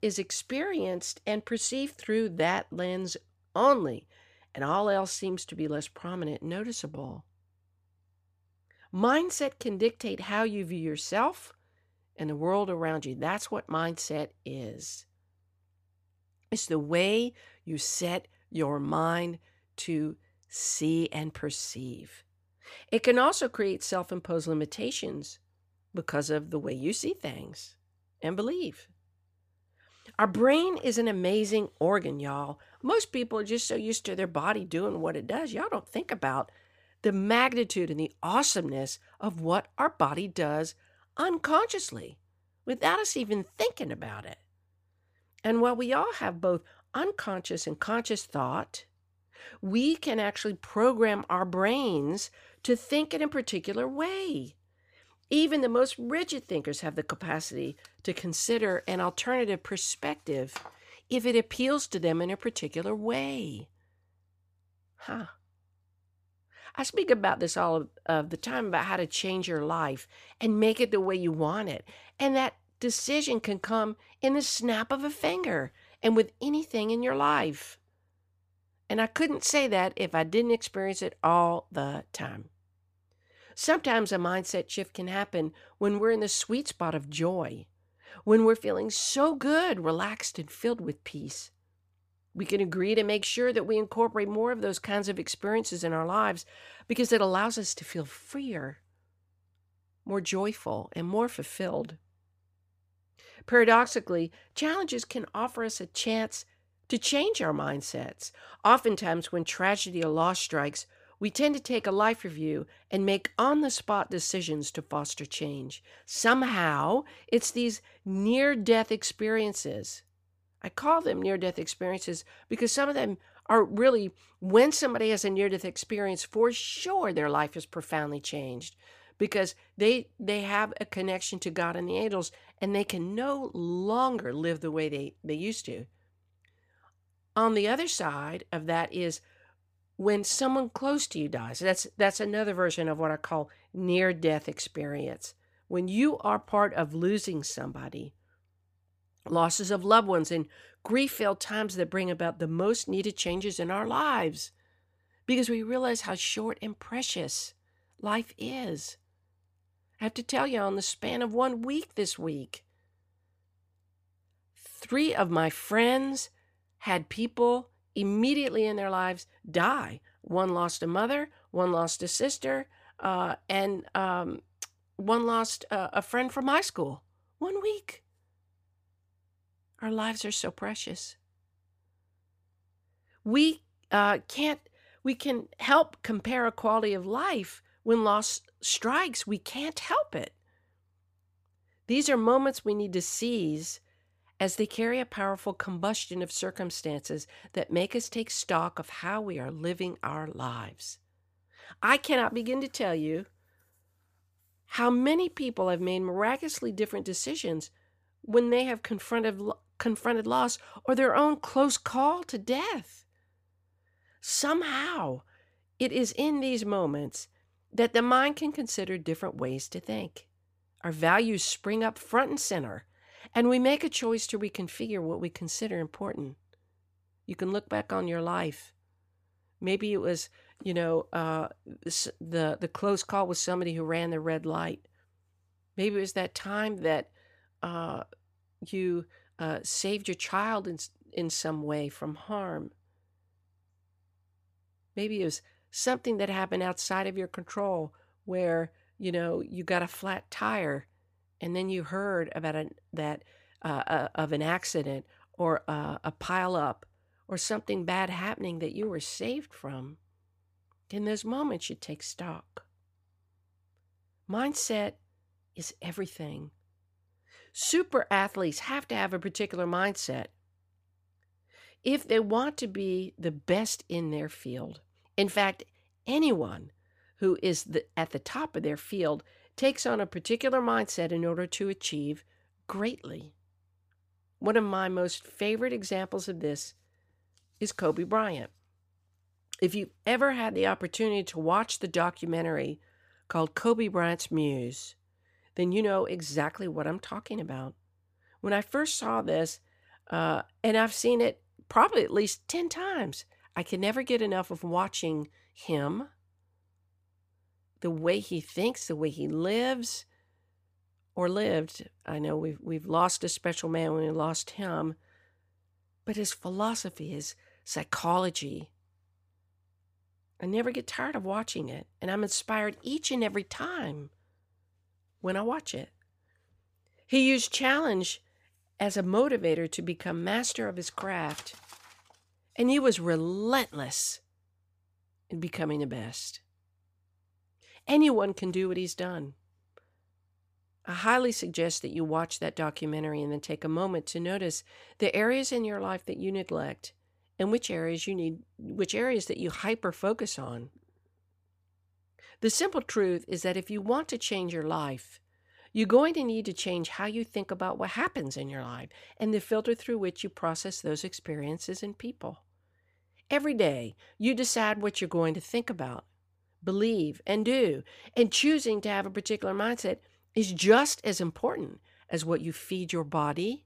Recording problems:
none

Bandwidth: 15 kHz